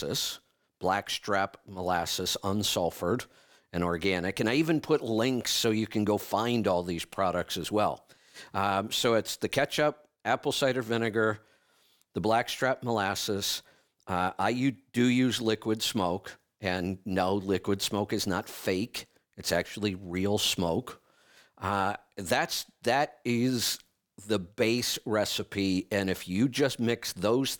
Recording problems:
abrupt cut into speech; at the start

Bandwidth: 18.5 kHz